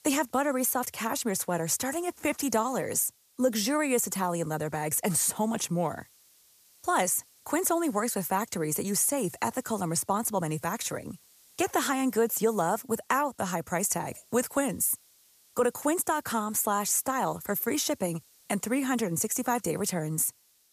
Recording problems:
hiss; faint; throughout; 30 dB below the speech

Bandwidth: 14.5 kHz